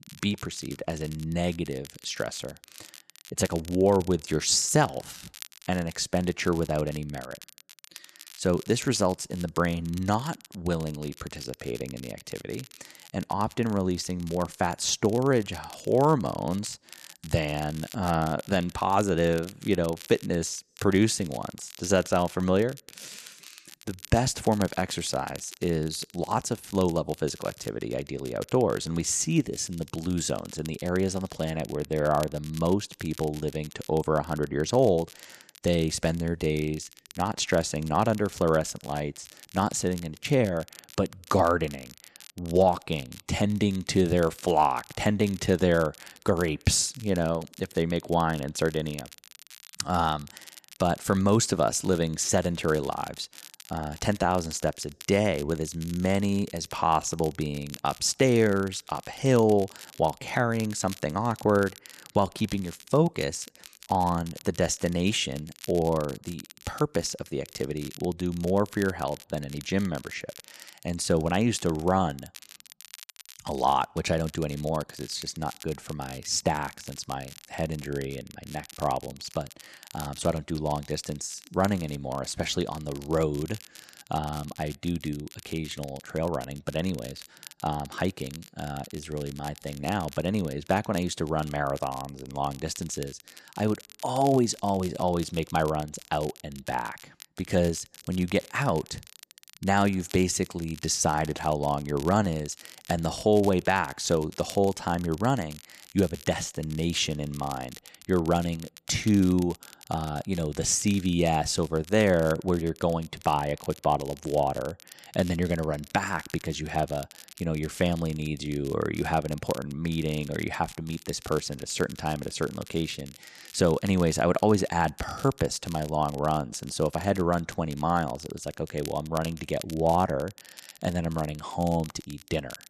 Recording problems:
crackle, like an old record; noticeable; 20 dB below the speech

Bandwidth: 13.5 kHz